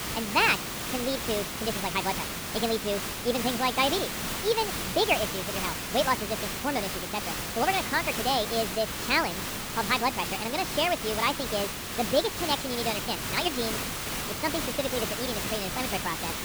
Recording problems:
wrong speed and pitch; too fast and too high; 1.6 times normal speed
high frequencies cut off; noticeable; nothing above 8 kHz
hiss; loud; throughout; 2 dB below the speech

